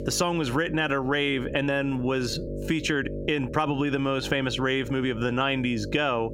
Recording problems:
squashed, flat; heavily
electrical hum; noticeable; throughout; 50 Hz, 15 dB below the speech
uneven, jittery; strongly; from 1 to 5.5 s

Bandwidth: 16 kHz